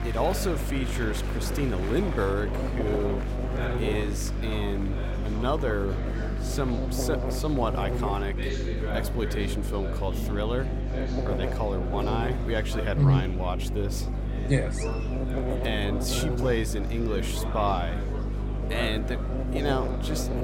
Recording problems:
electrical hum; loud; throughout; 50 Hz, 7 dB below the speech
murmuring crowd; loud; throughout; 8 dB below the speech

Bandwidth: 16.5 kHz